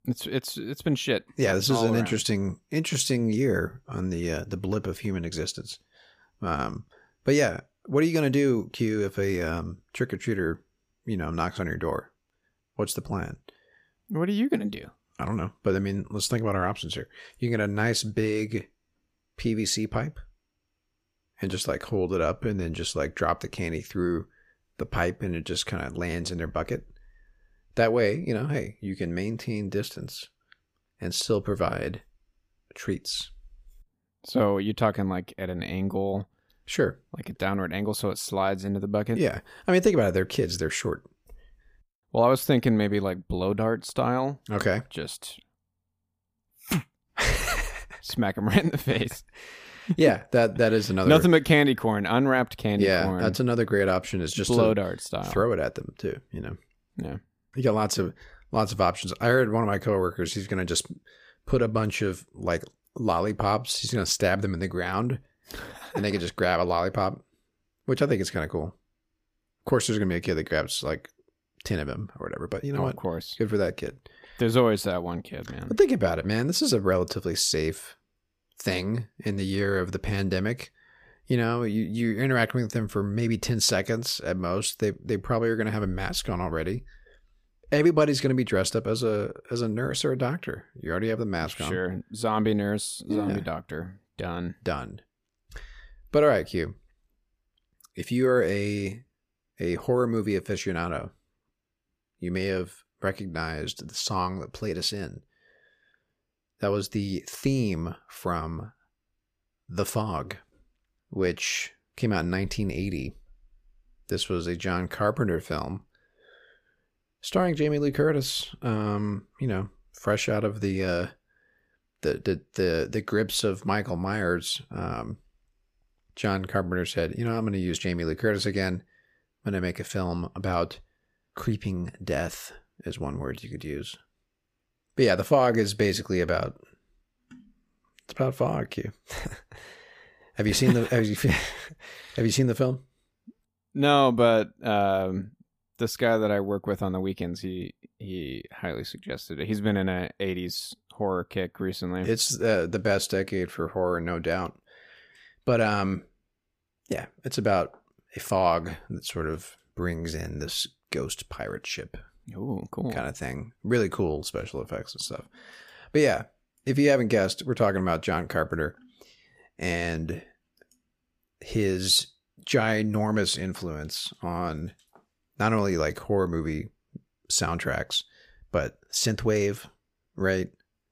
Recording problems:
none

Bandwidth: 15 kHz